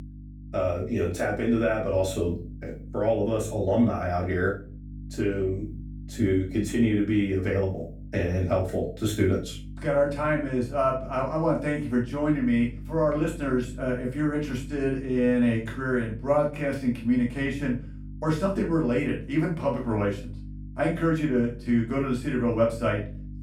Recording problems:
off-mic speech; far
room echo; slight; dies away in 0.3 s
electrical hum; faint; throughout; 50 Hz, 25 dB below the speech

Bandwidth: 18 kHz